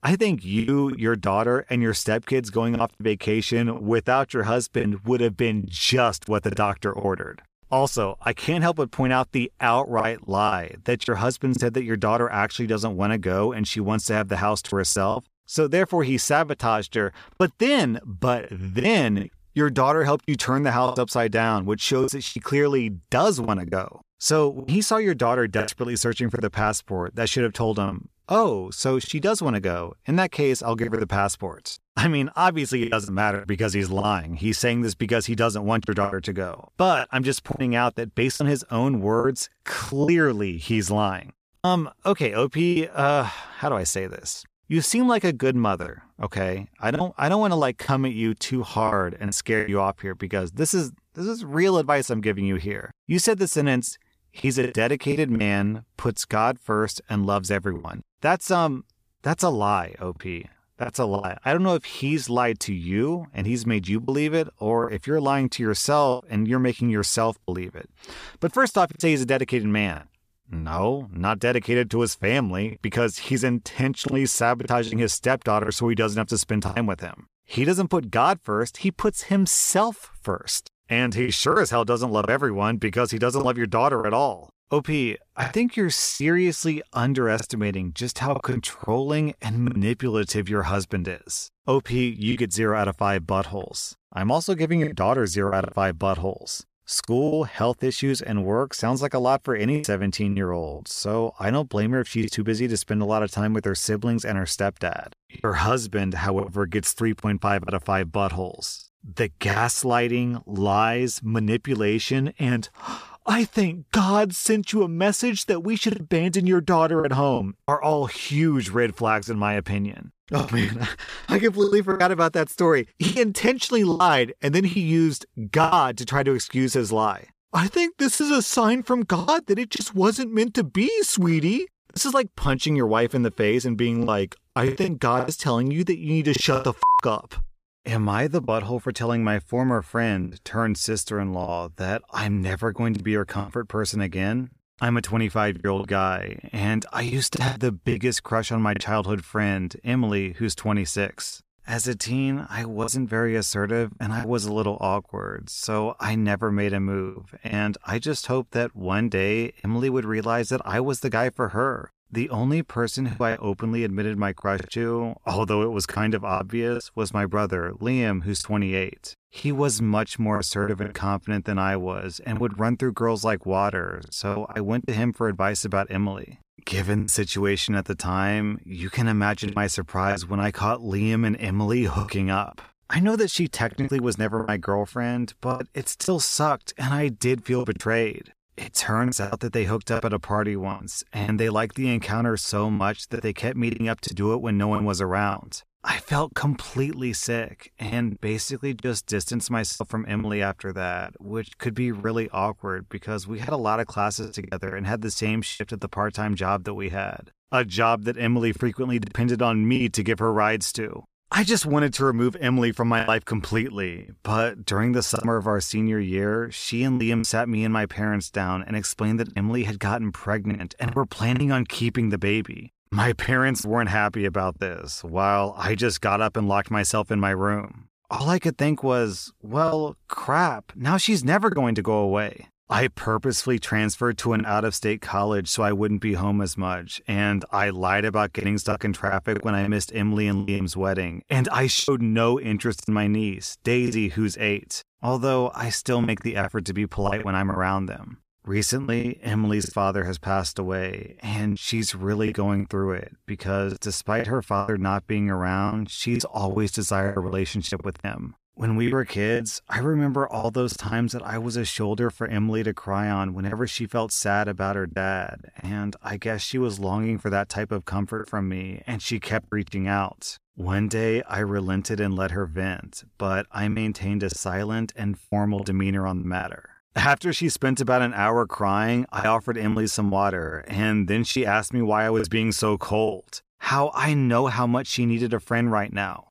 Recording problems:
choppy; very; 5% of the speech affected

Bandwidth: 14.5 kHz